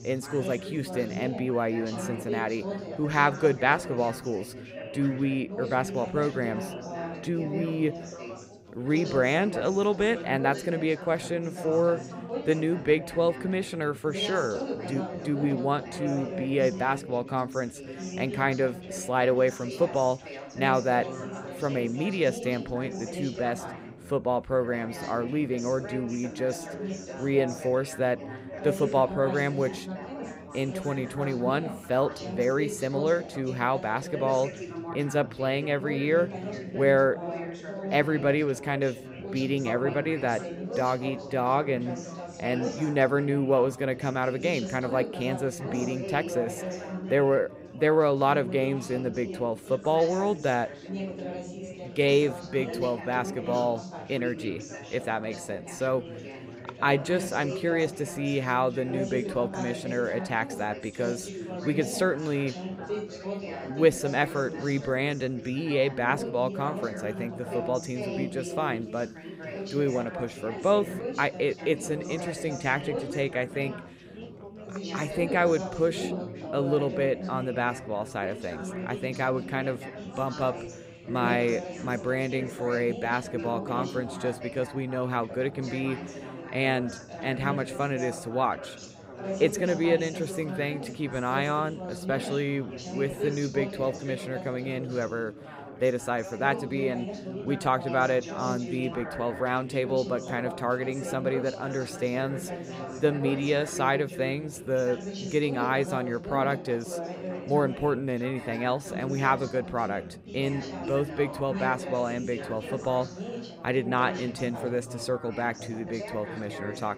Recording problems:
background chatter; loud; throughout; 4 voices, 9 dB below the speech

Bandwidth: 15.5 kHz